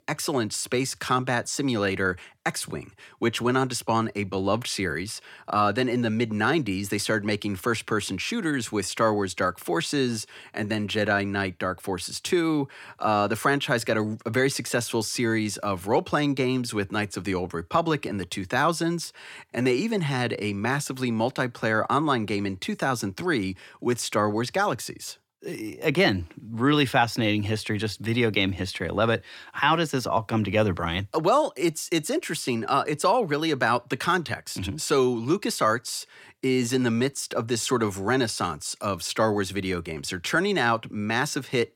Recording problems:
none

